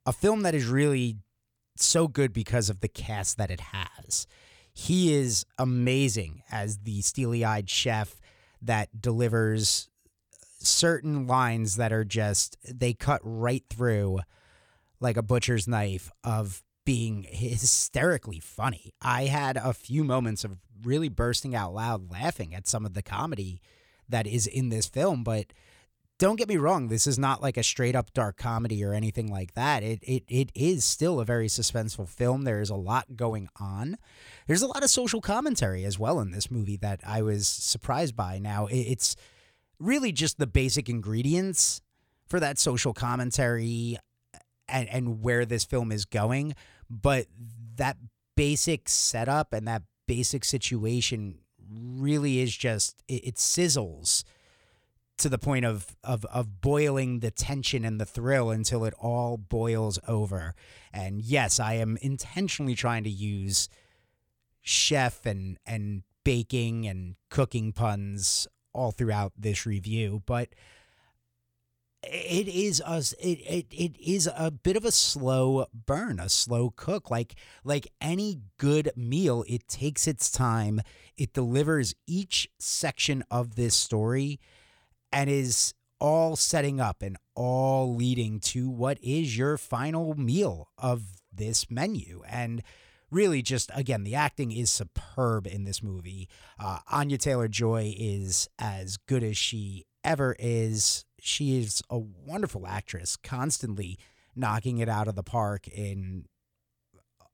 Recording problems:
none

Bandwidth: 18.5 kHz